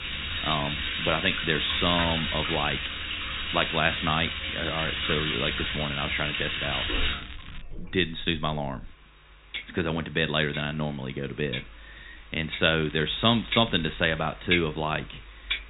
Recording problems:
high frequencies cut off; severe; nothing above 4 kHz
household noises; loud; throughout; 2 dB below the speech
crackling; noticeable; from 5 to 7.5 s and from 13 to 14 s; 20 dB below the speech

